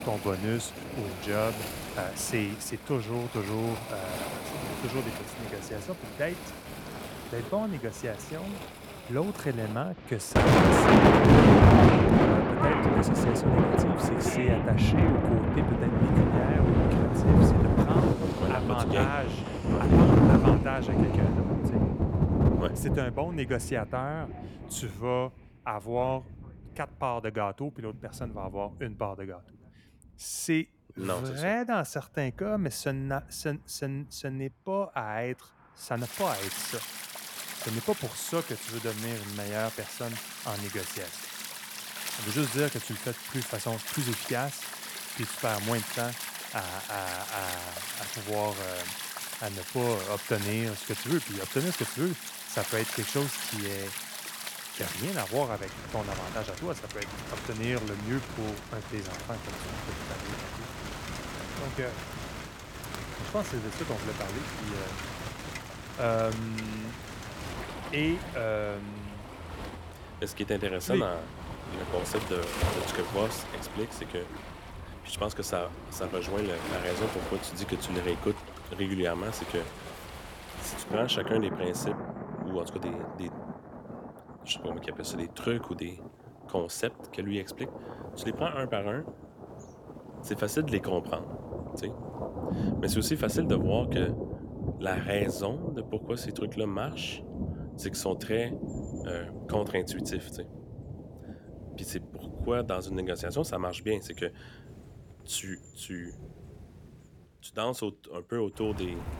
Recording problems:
rain or running water; very loud; throughout; 4 dB above the speech

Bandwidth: 18 kHz